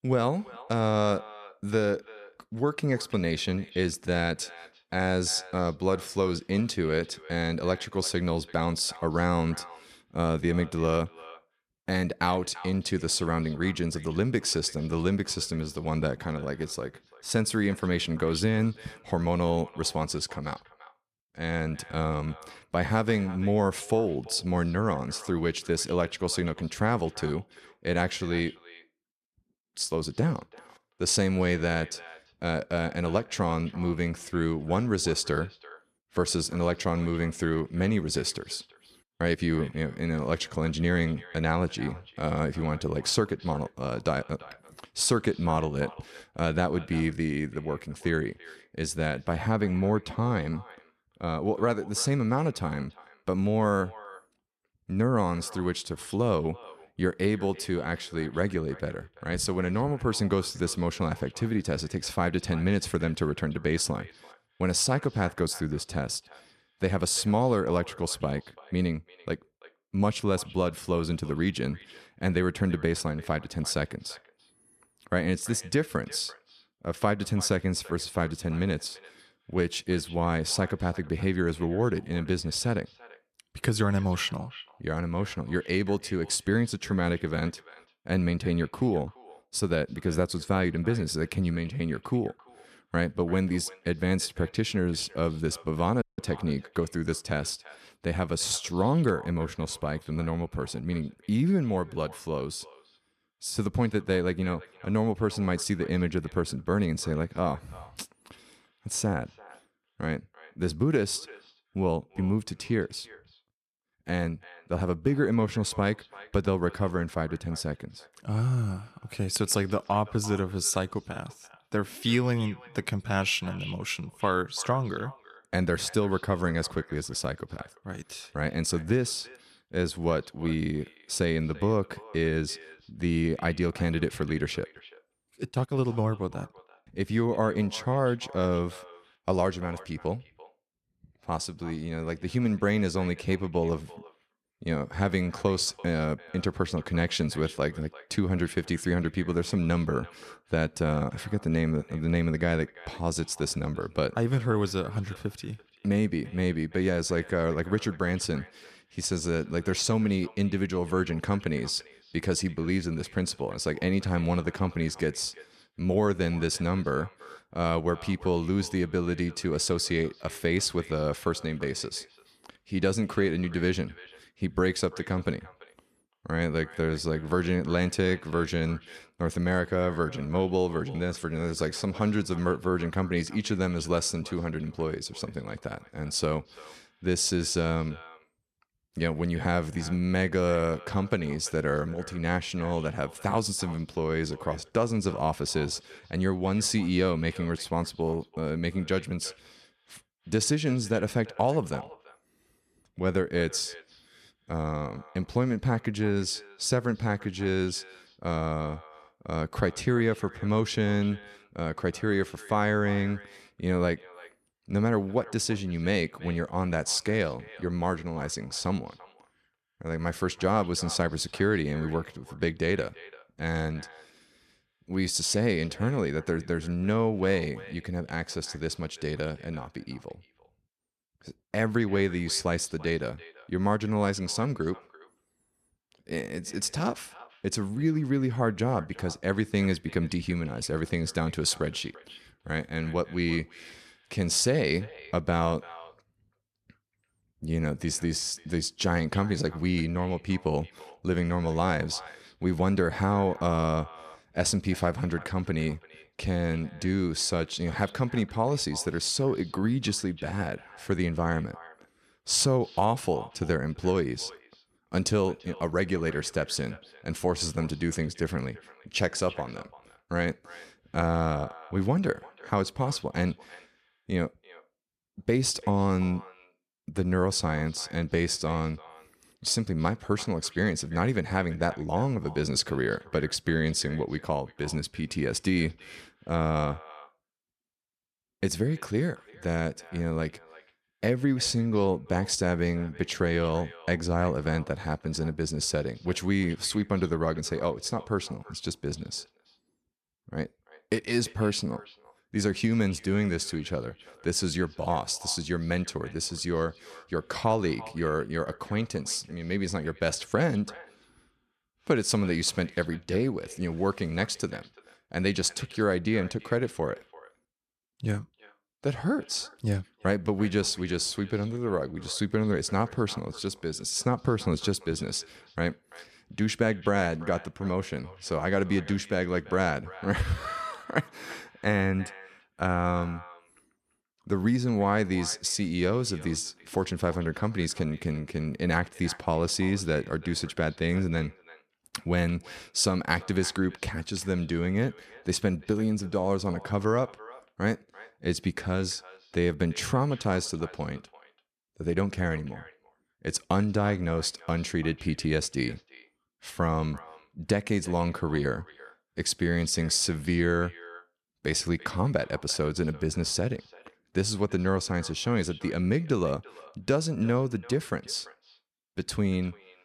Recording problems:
echo of what is said; faint; throughout; 340 ms later, 20 dB below the speech
audio cutting out; at 1:36

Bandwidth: 14 kHz